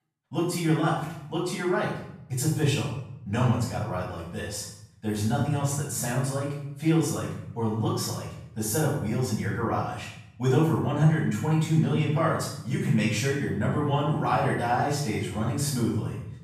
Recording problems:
off-mic speech; far
room echo; noticeable; dies away in 0.8 s

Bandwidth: 14.5 kHz